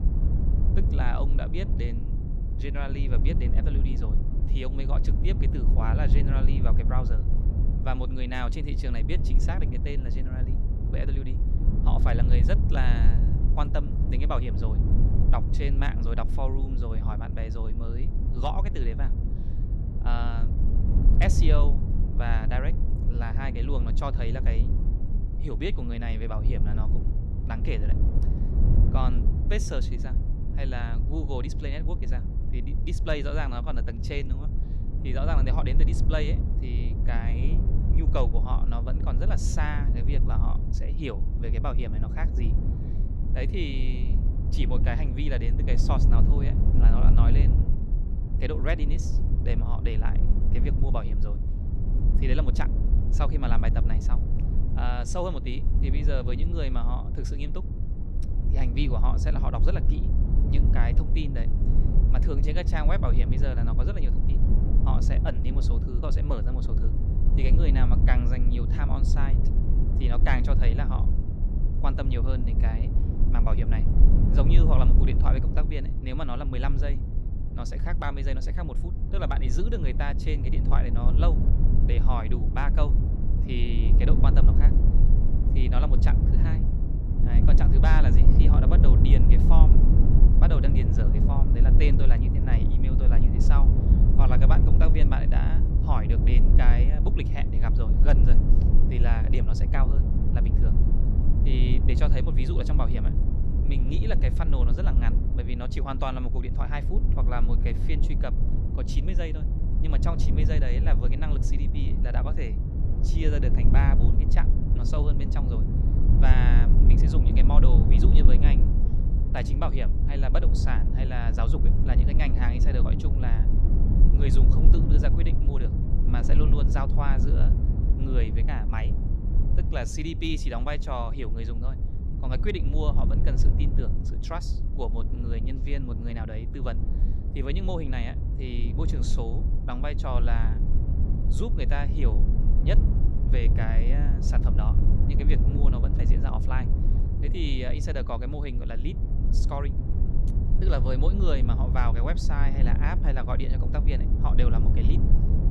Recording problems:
low rumble; loud; throughout; 4 dB below the speech

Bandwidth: 15 kHz